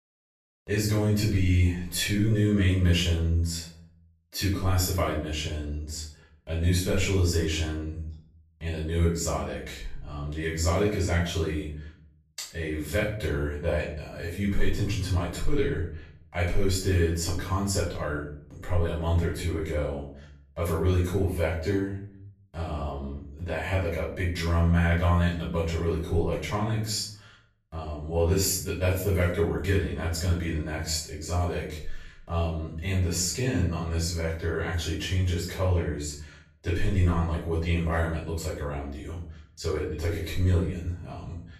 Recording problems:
off-mic speech; far
room echo; noticeable; dies away in 0.5 s

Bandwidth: 13.5 kHz